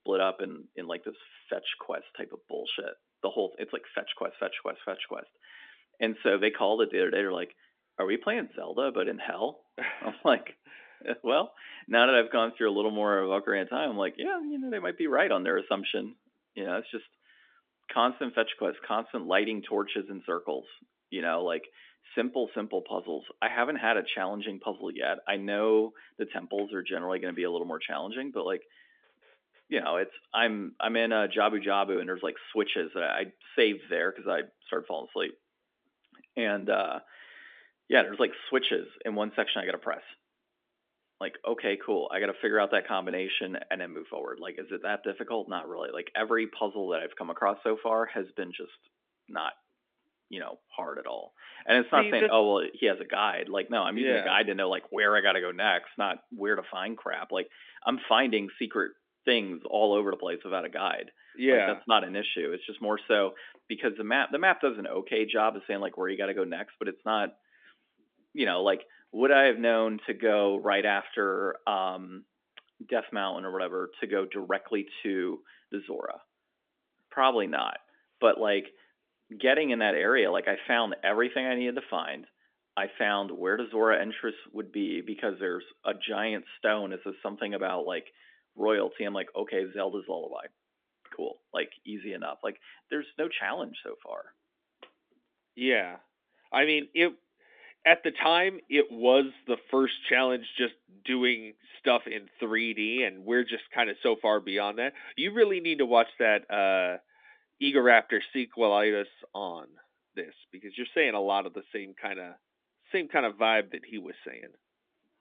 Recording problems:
phone-call audio; nothing above 3.5 kHz

